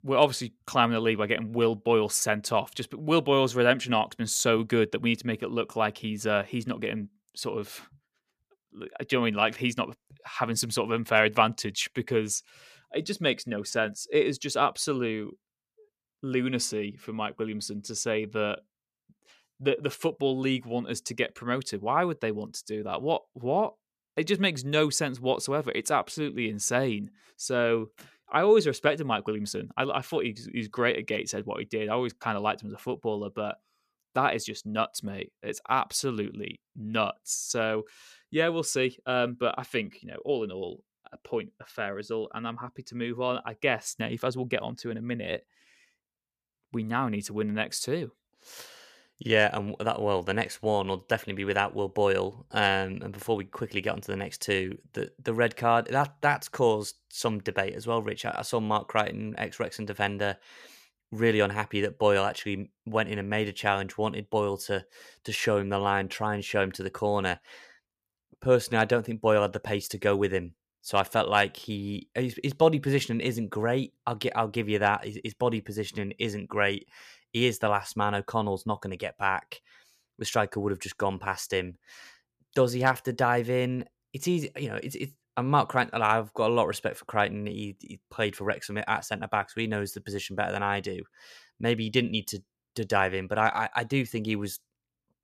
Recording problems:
none

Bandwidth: 14.5 kHz